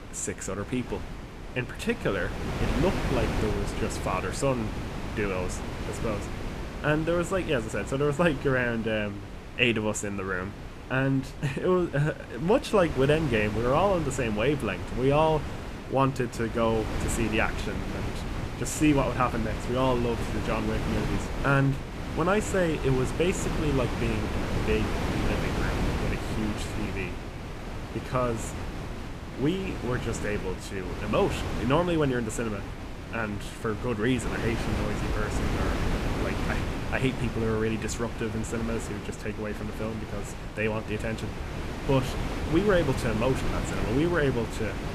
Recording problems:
wind noise on the microphone; heavy; 7 dB below the speech

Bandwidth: 14.5 kHz